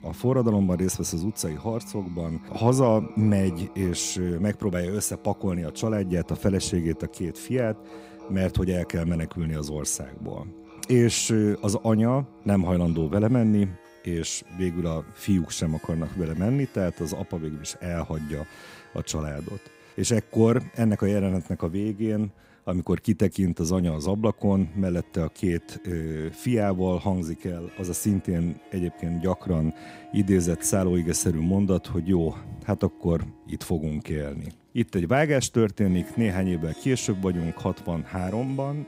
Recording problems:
background music; faint; throughout; 20 dB below the speech

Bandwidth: 15.5 kHz